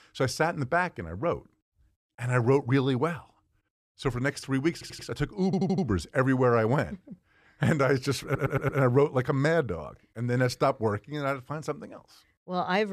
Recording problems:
audio stuttering; at 4.5 s, at 5.5 s and at 8 s
abrupt cut into speech; at the end

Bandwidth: 14 kHz